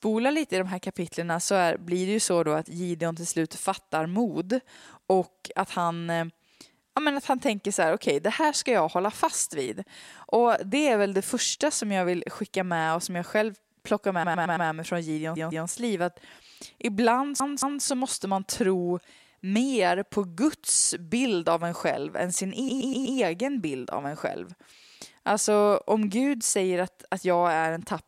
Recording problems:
audio stuttering; 4 times, first at 14 s

